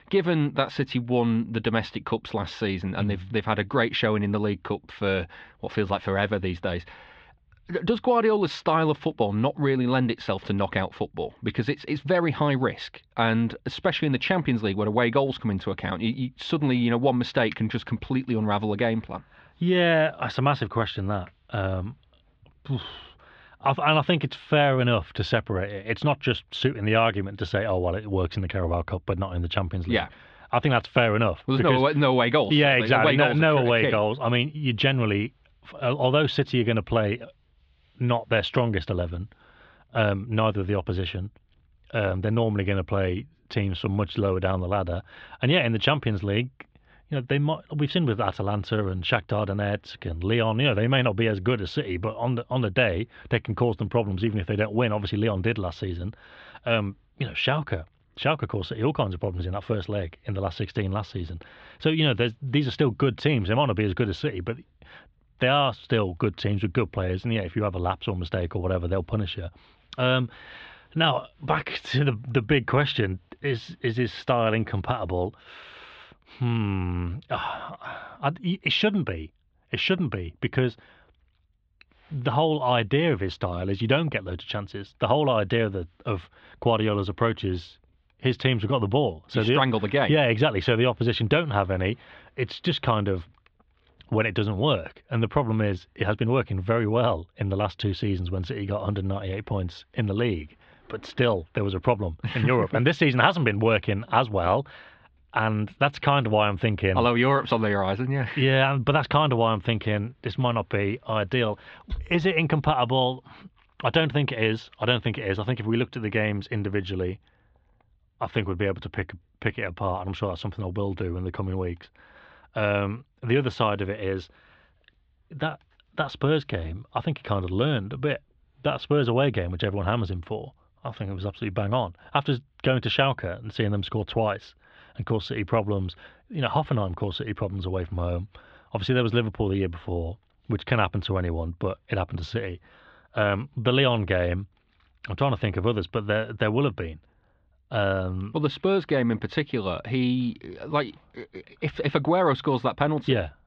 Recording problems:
muffled; very; fading above 3.5 kHz

